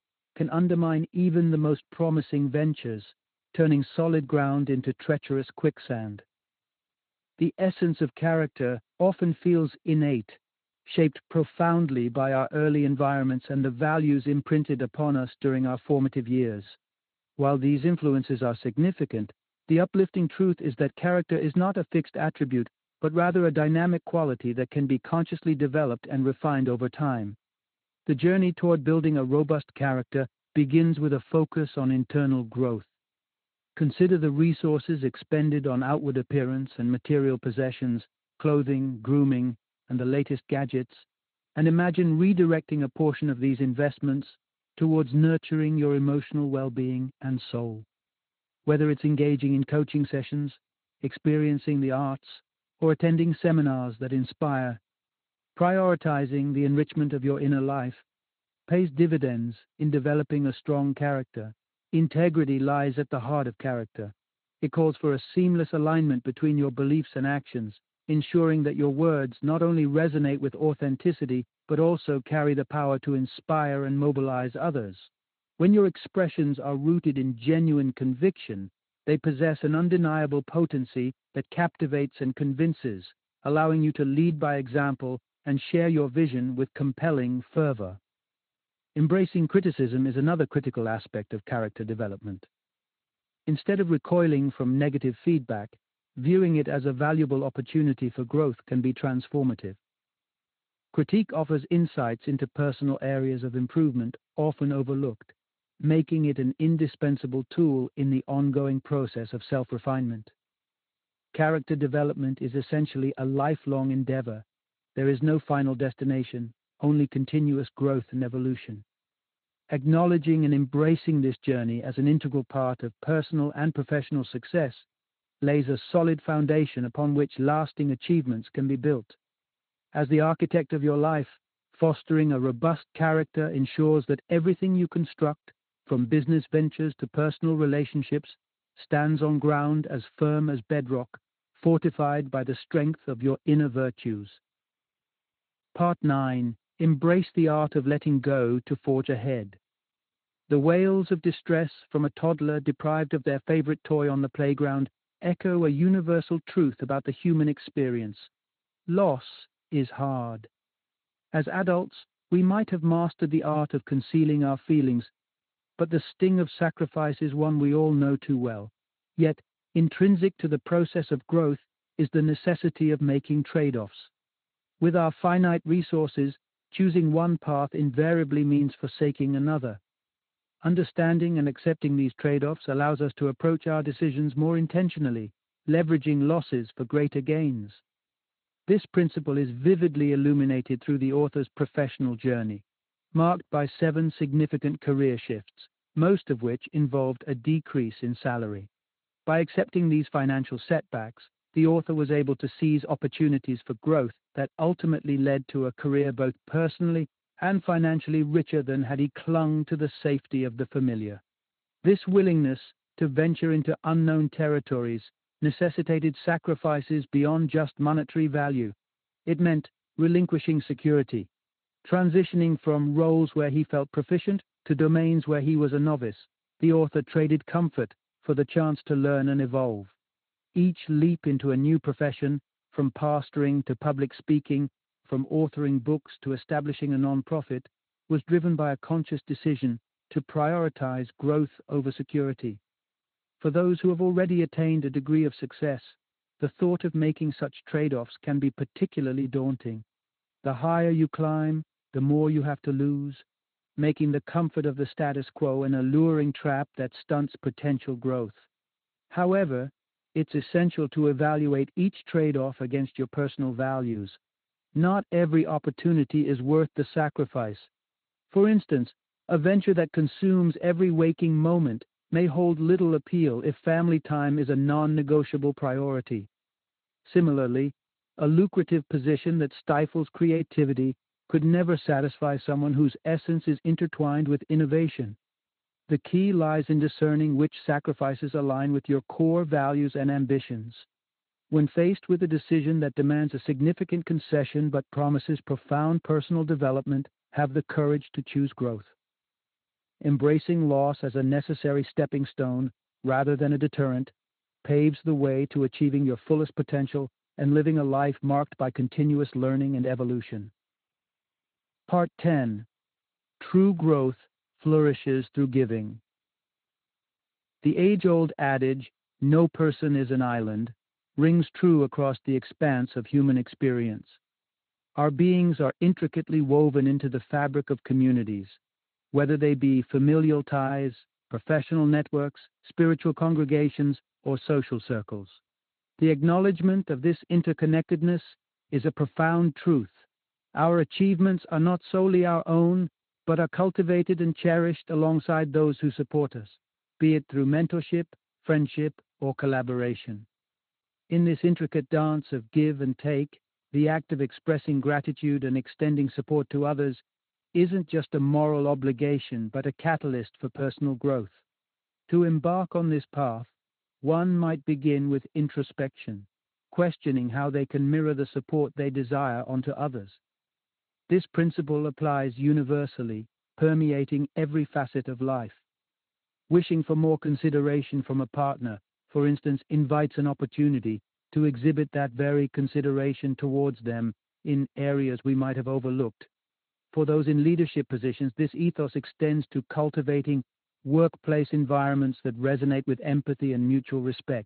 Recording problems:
high frequencies cut off; severe; nothing above 4 kHz
garbled, watery; slightly

